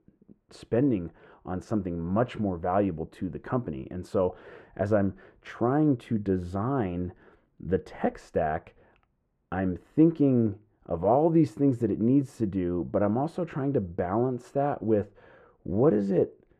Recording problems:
muffled; very; fading above 3 kHz

